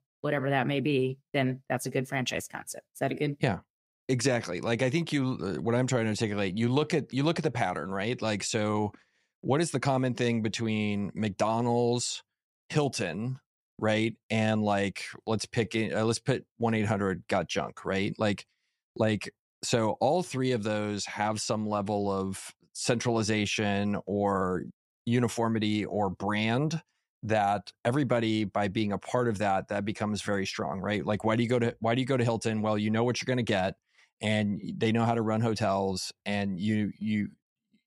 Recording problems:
none

